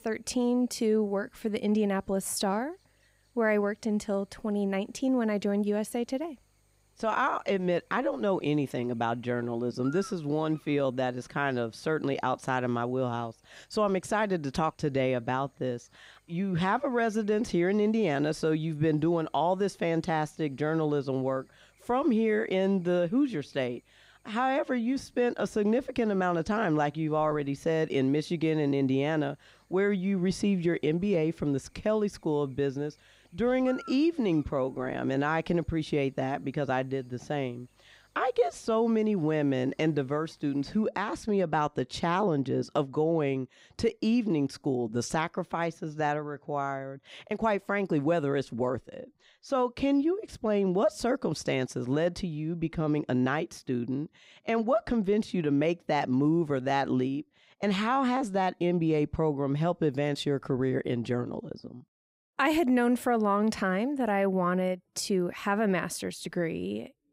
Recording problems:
electrical hum; faint; until 41 s; 50 Hz, 25 dB below the speech

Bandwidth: 15.5 kHz